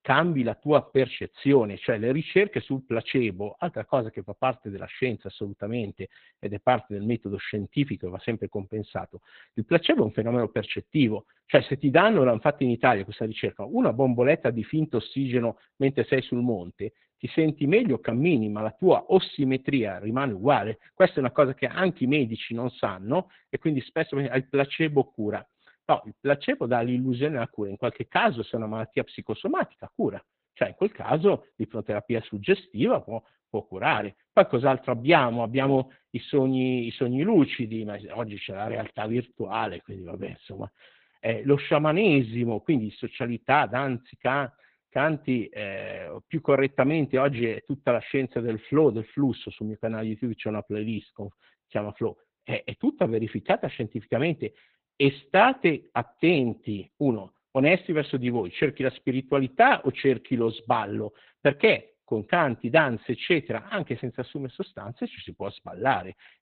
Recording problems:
garbled, watery; badly; nothing above 4 kHz

